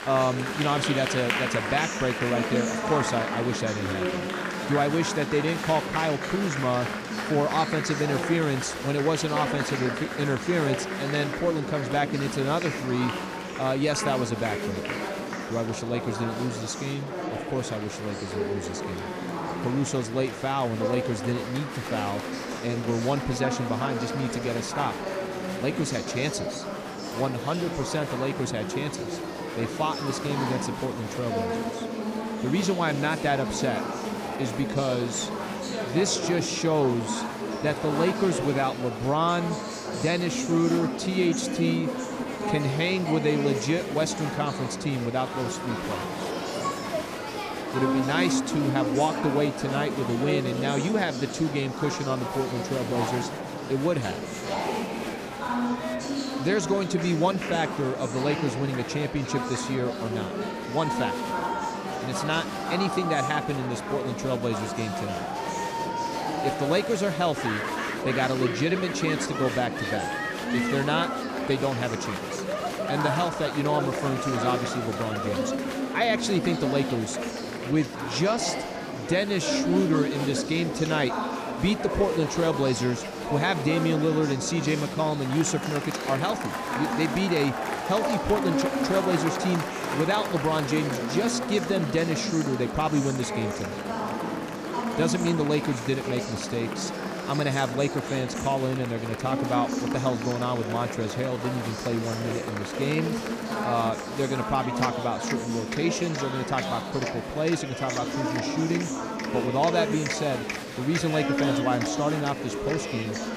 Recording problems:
murmuring crowd; loud; throughout; 3 dB below the speech

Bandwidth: 15 kHz